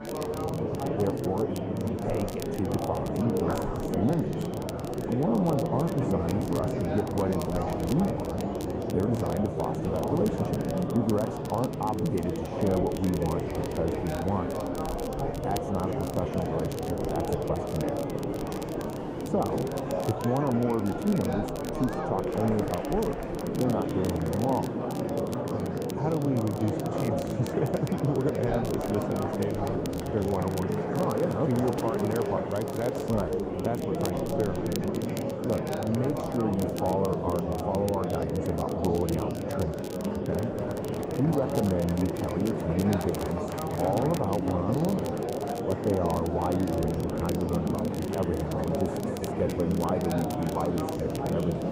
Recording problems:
muffled; very; fading above 1 kHz
murmuring crowd; loud; throughout; as loud as the speech
crackle, like an old record; noticeable; 15 dB below the speech

